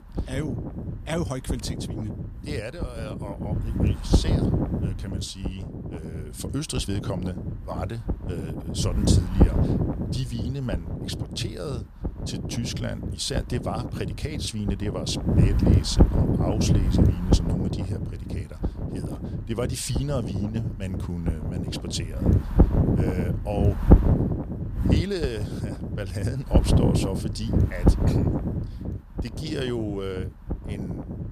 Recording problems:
wind noise on the microphone; heavy; as loud as the speech

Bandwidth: 15 kHz